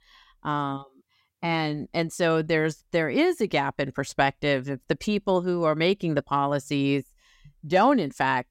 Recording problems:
none

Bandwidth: 16 kHz